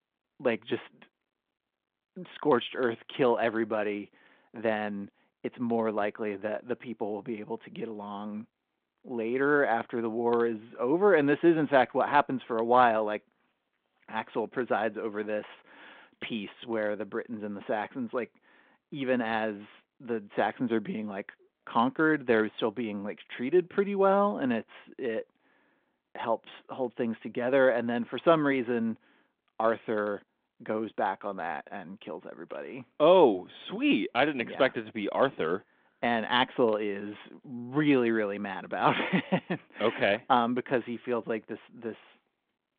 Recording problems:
phone-call audio

